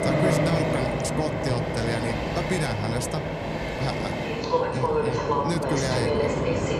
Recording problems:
train or aircraft noise; very loud; throughout; 4 dB above the speech

